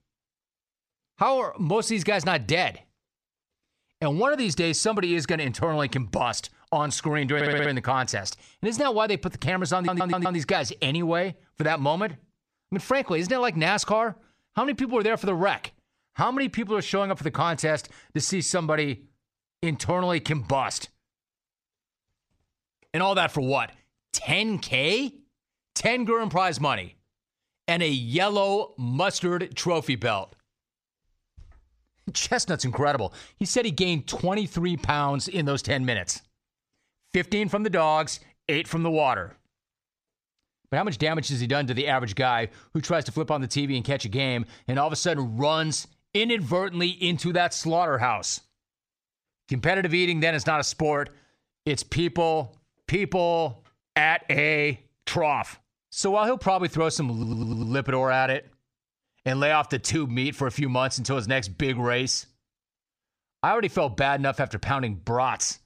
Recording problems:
audio stuttering; at 7.5 s, at 10 s and at 57 s

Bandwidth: 14.5 kHz